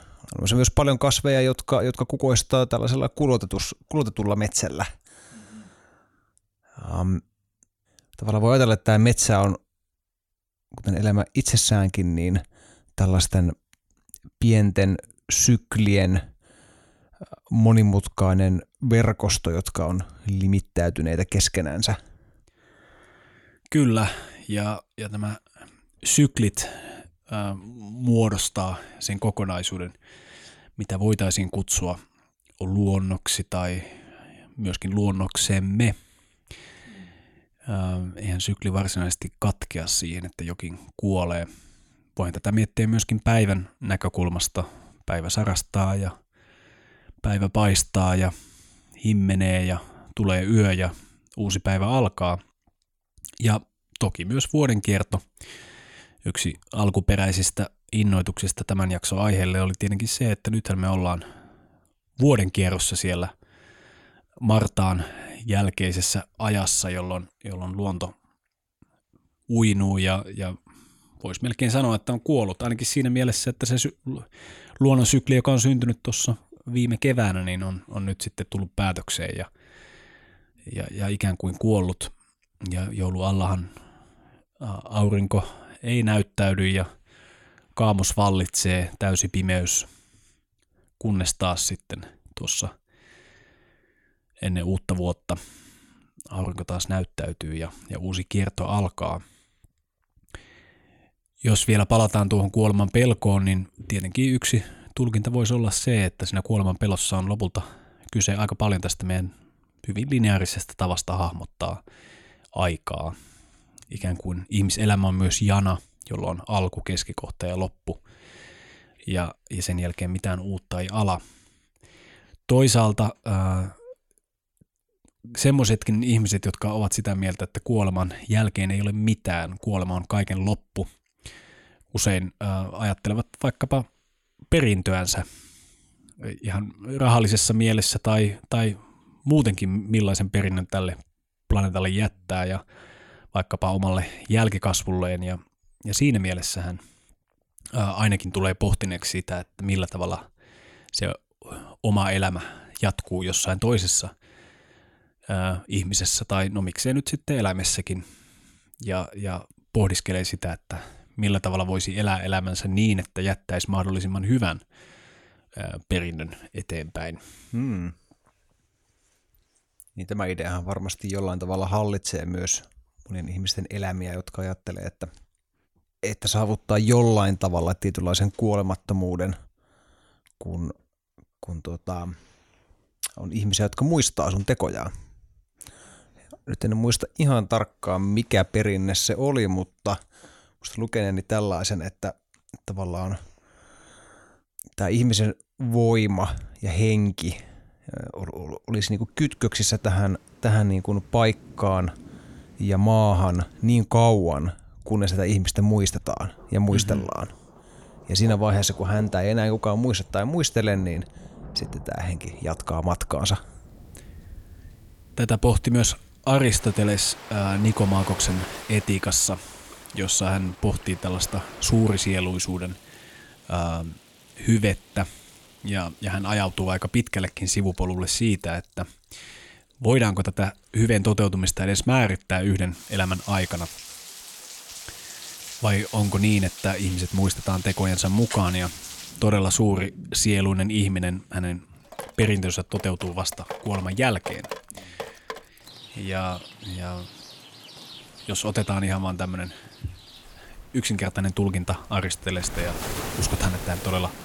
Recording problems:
rain or running water; noticeable; from 3:19 on; 15 dB below the speech

